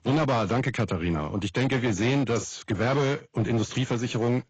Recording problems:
garbled, watery; badly; nothing above 7.5 kHz
distortion; slight; 11% of the sound clipped

